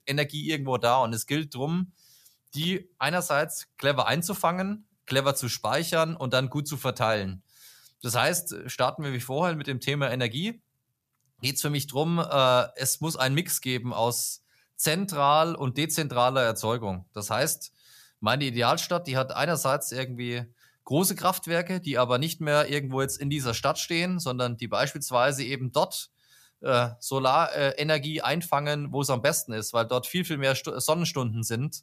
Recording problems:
none

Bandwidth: 14.5 kHz